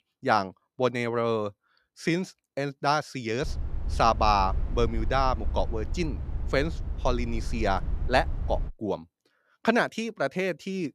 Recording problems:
low rumble; faint; from 3.5 to 8.5 s; 20 dB below the speech

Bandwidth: 14.5 kHz